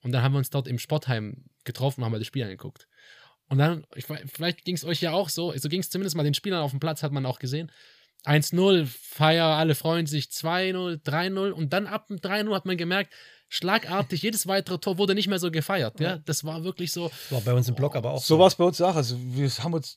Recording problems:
none

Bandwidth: 15 kHz